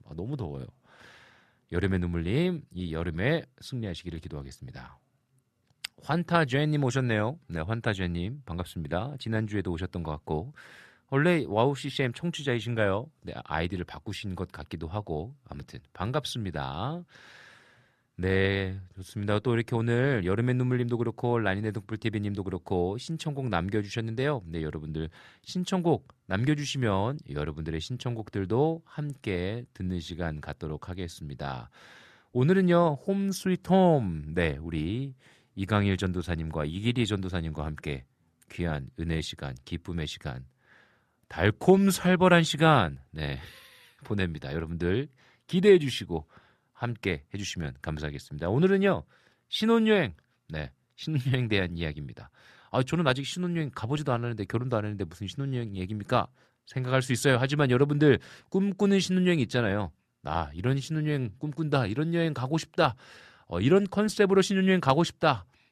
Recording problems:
none

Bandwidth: 13.5 kHz